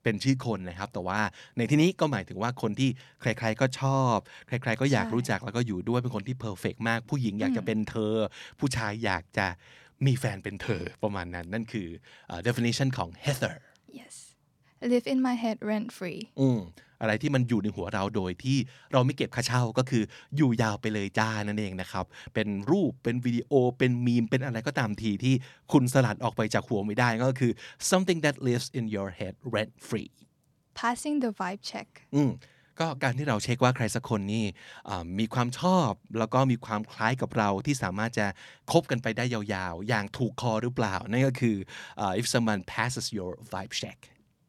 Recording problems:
none

